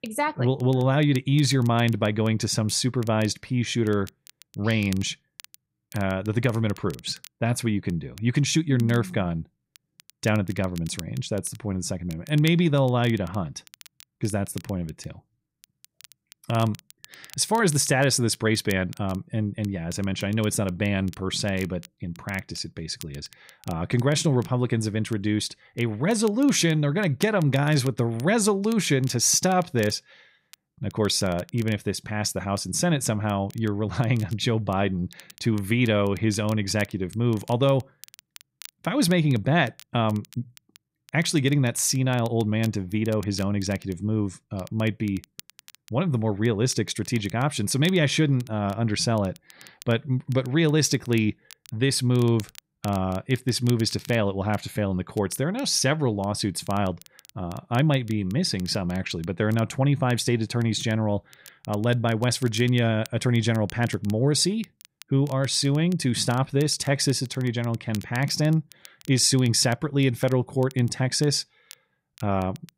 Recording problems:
crackle, like an old record; faint; 25 dB below the speech

